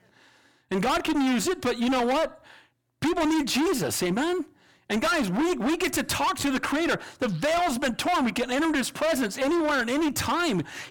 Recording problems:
distortion; heavy; 27% of the sound clipped

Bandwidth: 17.5 kHz